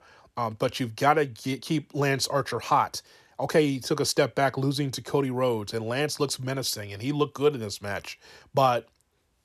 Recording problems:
none

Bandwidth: 13.5 kHz